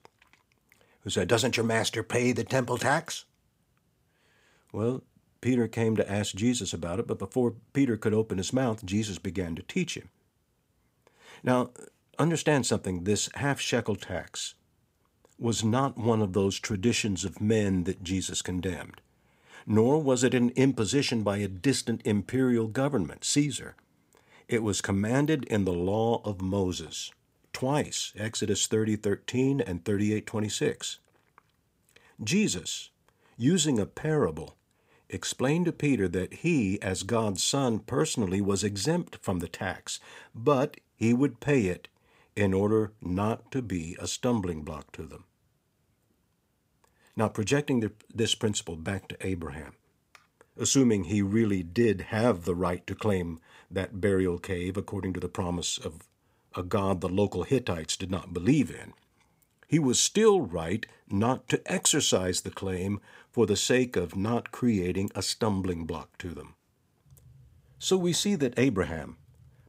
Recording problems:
none

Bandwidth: 15.5 kHz